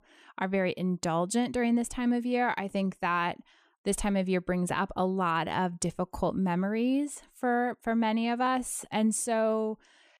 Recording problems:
none

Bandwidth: 14.5 kHz